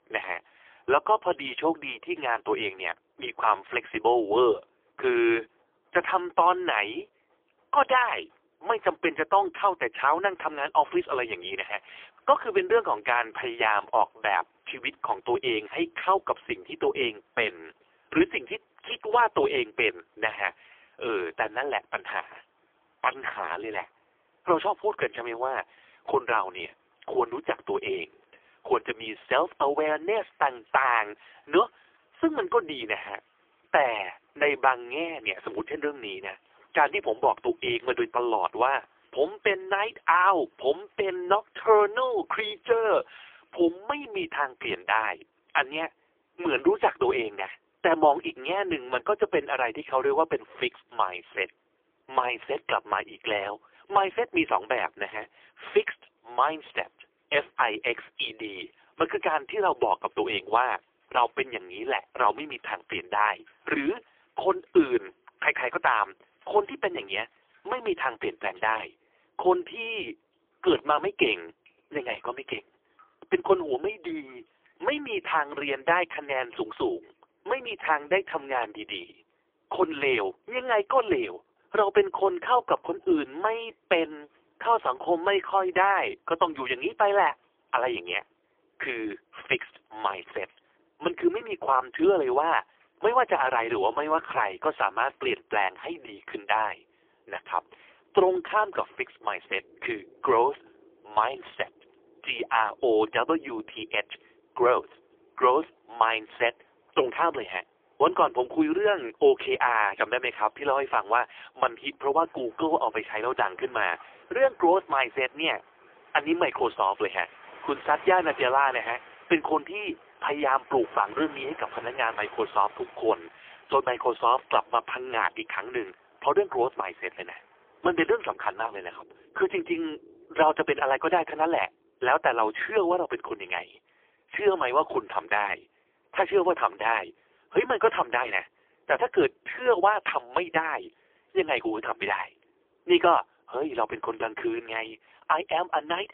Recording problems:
phone-call audio; poor line; nothing above 3.5 kHz
rain or running water; faint; throughout; 25 dB below the speech

